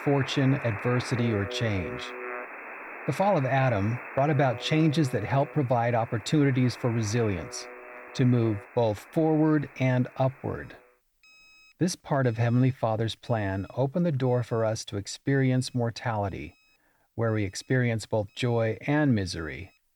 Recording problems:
alarms or sirens; noticeable; throughout; 15 dB below the speech

